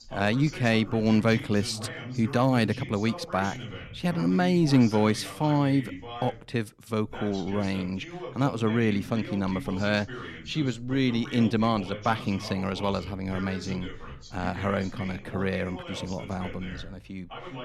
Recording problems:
voice in the background; noticeable; throughout; 10 dB below the speech

